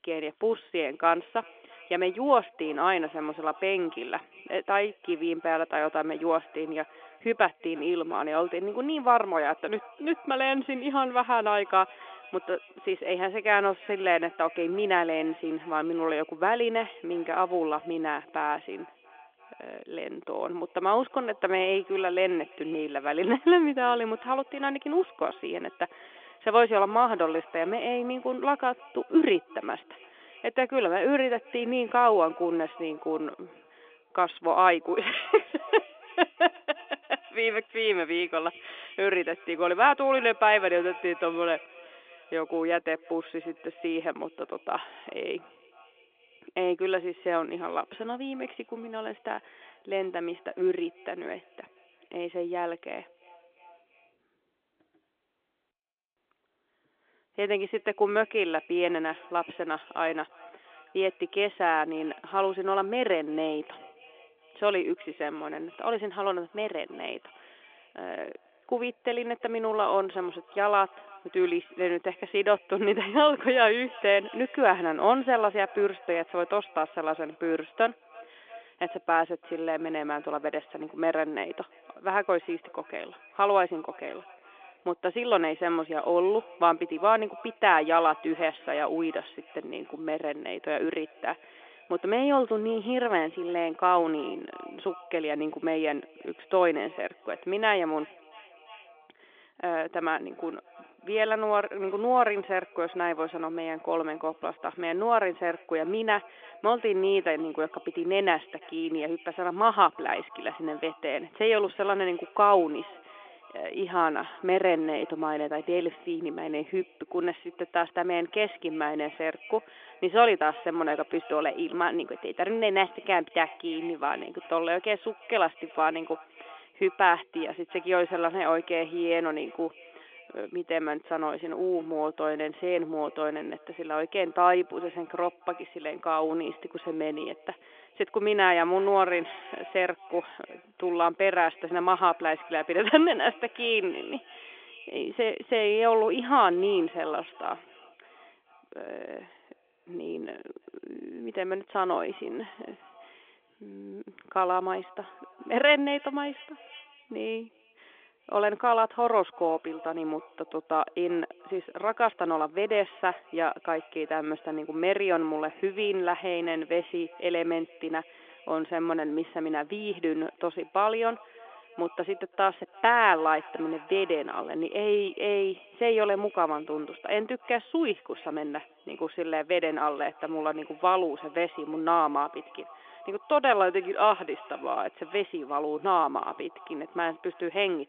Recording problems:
echo of what is said; faint; throughout; 340 ms later, 20 dB below the speech
phone-call audio; nothing above 3.5 kHz

